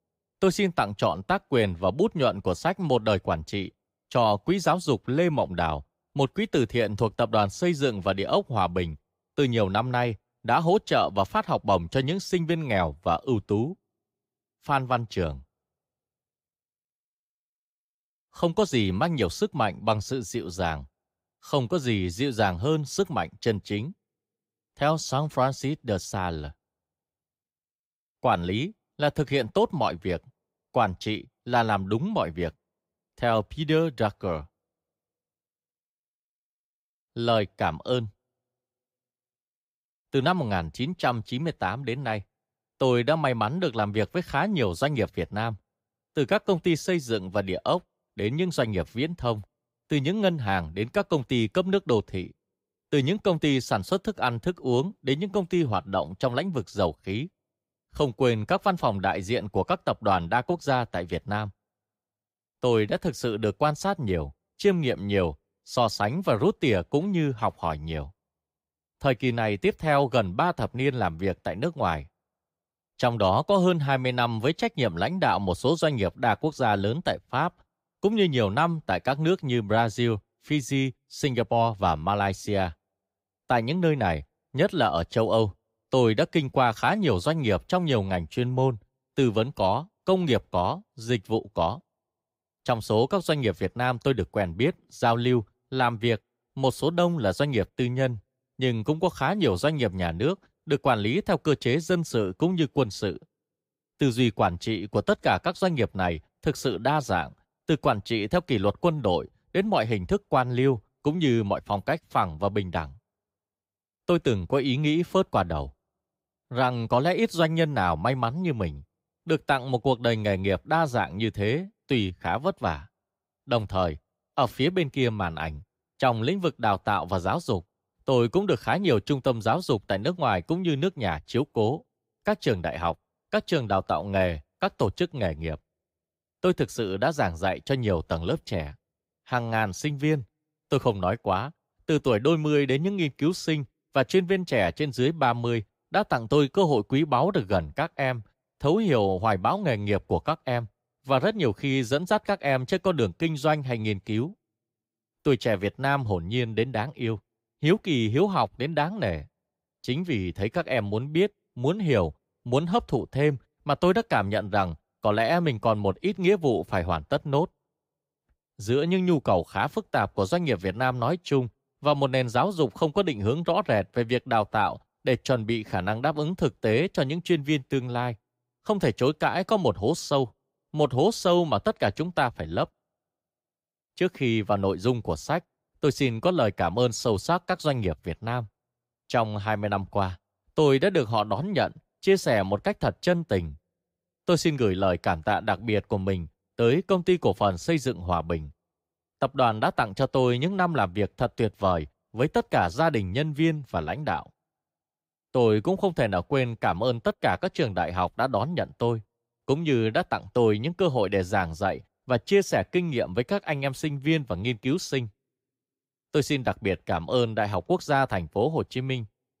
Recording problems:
none

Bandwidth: 15.5 kHz